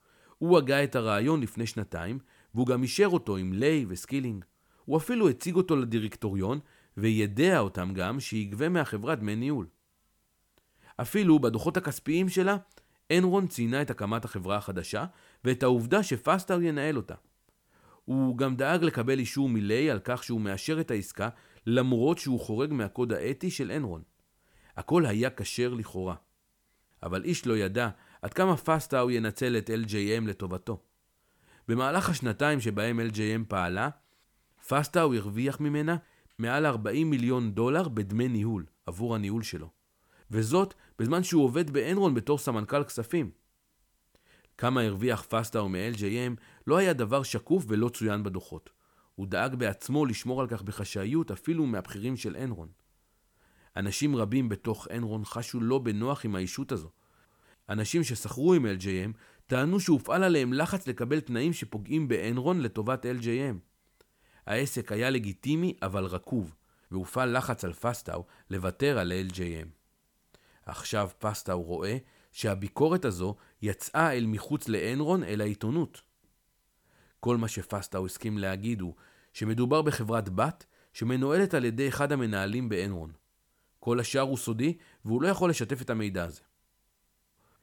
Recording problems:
uneven, jittery; slightly; from 2.5 s to 1:11

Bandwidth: 18 kHz